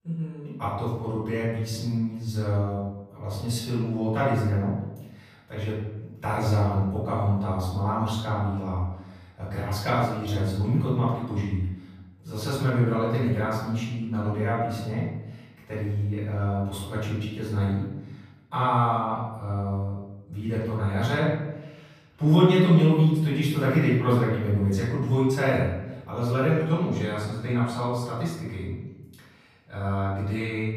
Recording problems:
off-mic speech; far
room echo; noticeable; dies away in 0.9 s

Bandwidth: 15 kHz